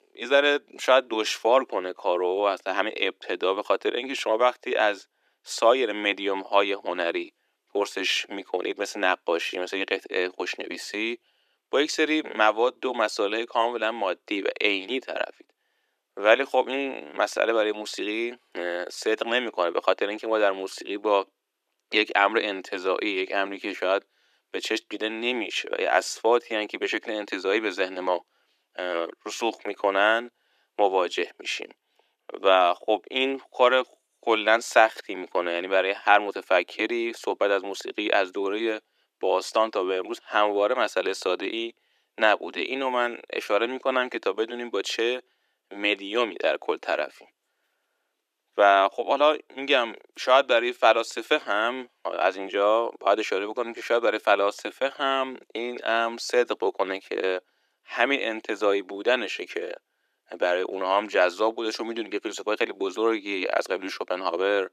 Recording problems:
thin; very; fading below 350 Hz

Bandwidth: 14.5 kHz